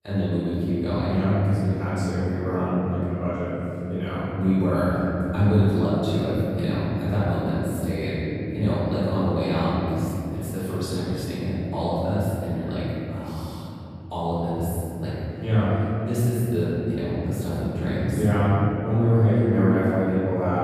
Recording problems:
room echo; strong; dies away in 3 s
off-mic speech; far

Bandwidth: 15 kHz